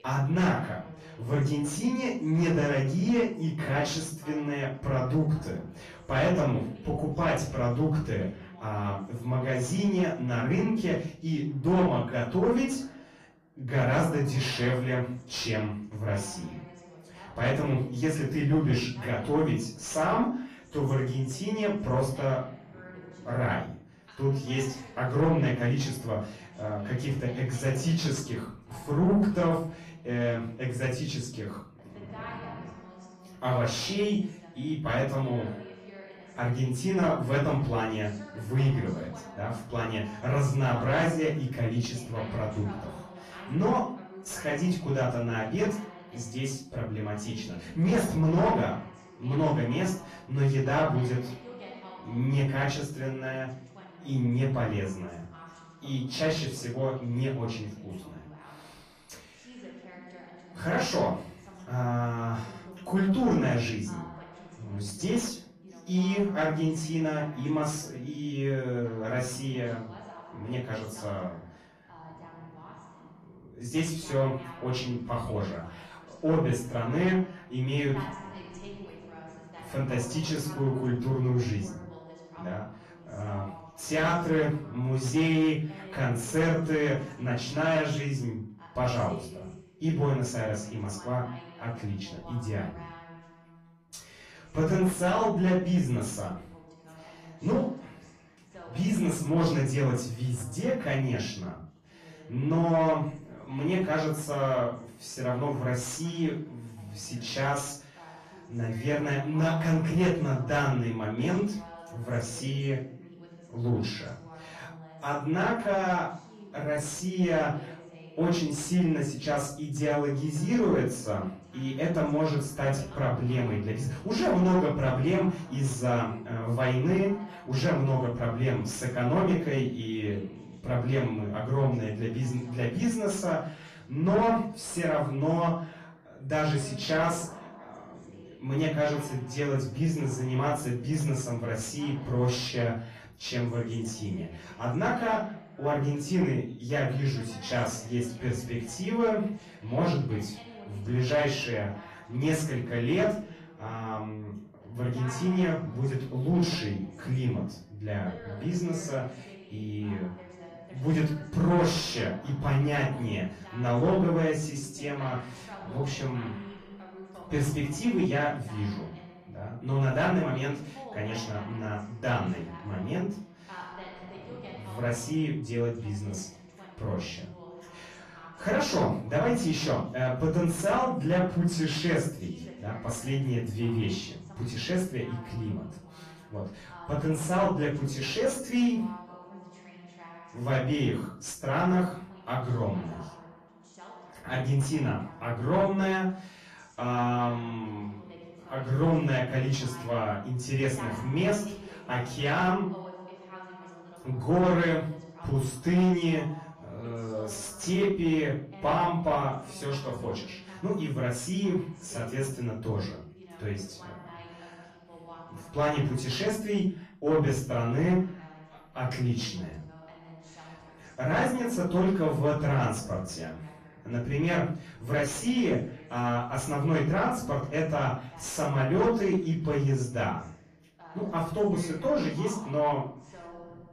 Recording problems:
off-mic speech; far
room echo; slight; dies away in 0.4 s
distortion; slight; 10 dB below the speech
garbled, watery; slightly
voice in the background; noticeable; throughout; 20 dB below the speech

